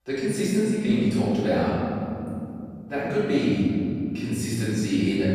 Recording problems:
room echo; strong; dies away in 3 s
off-mic speech; far

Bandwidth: 14.5 kHz